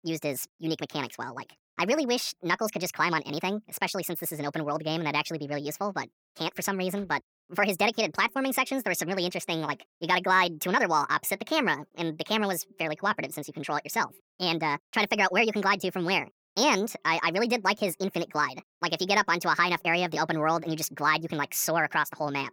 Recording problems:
wrong speed and pitch; too fast and too high; 1.6 times normal speed

